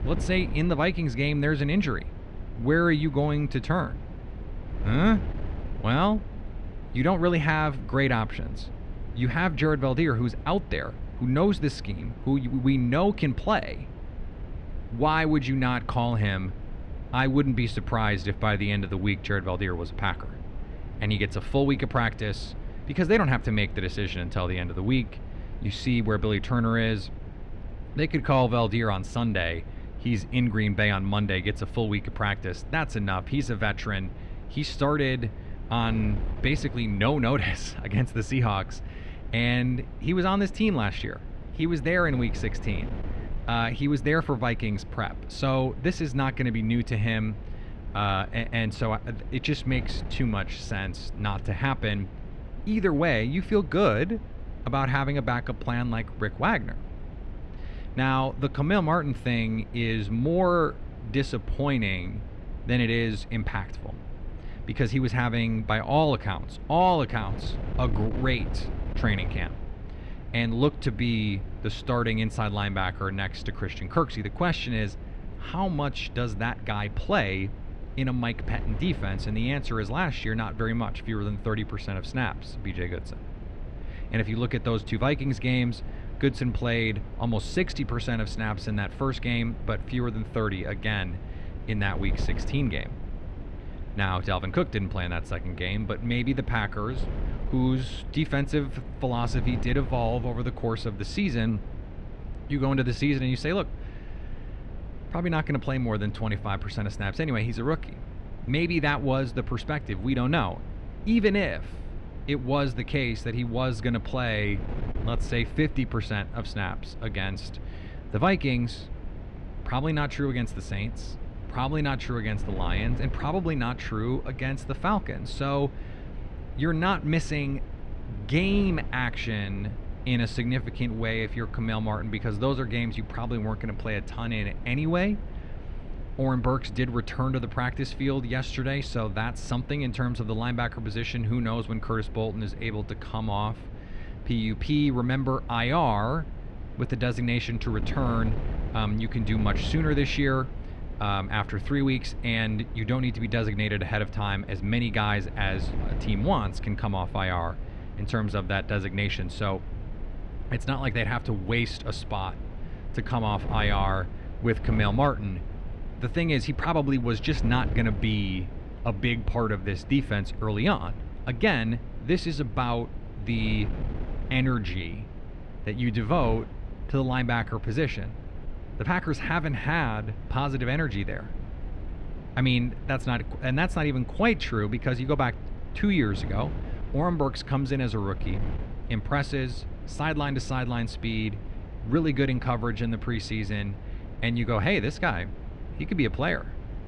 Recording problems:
muffled; slightly; fading above 3 kHz
wind noise on the microphone; occasional gusts; 20 dB below the speech

